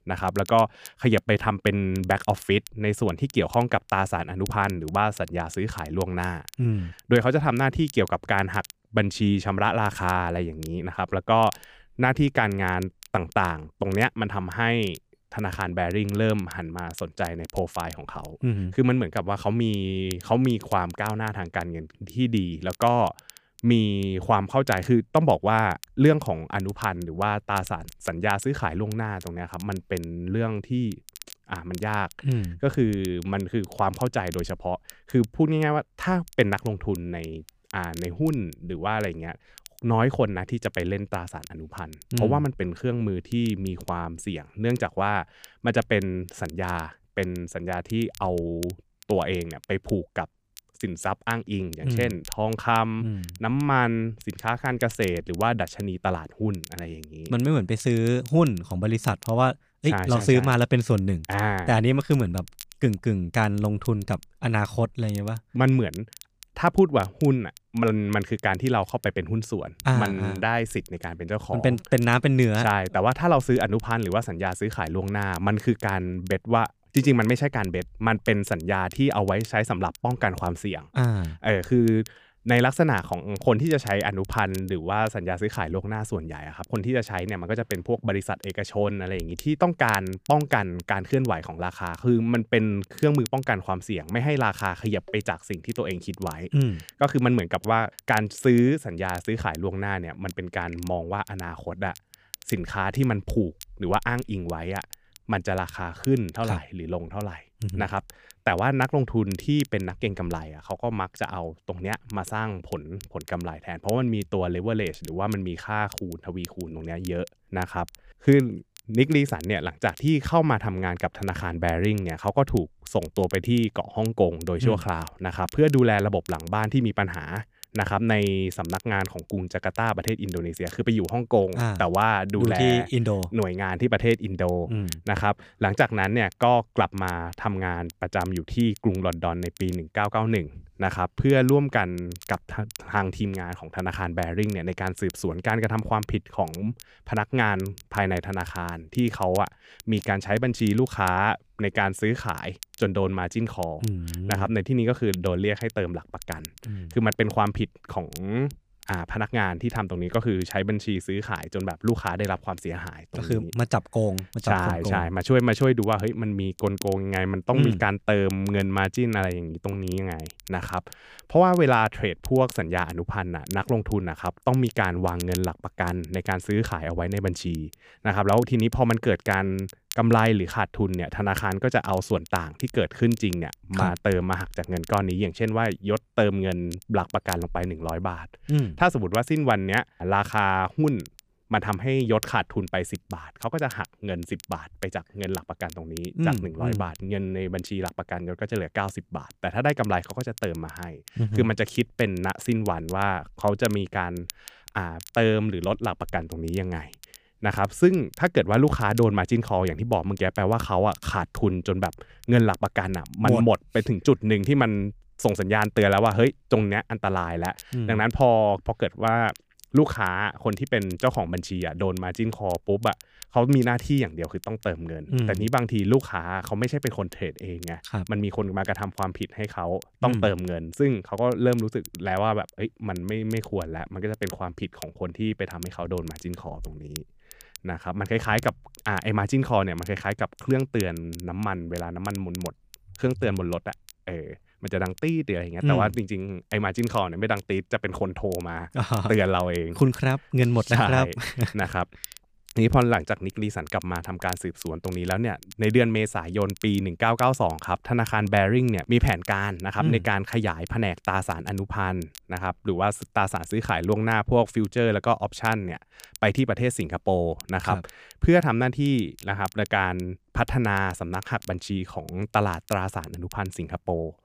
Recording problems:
crackle, like an old record; faint; 20 dB below the speech

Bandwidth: 15 kHz